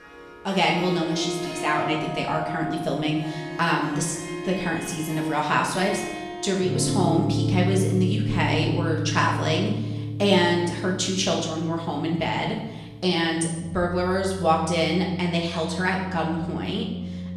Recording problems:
off-mic speech; far
room echo; noticeable; dies away in 0.8 s
background music; loud; throughout; 6 dB below the speech

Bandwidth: 14 kHz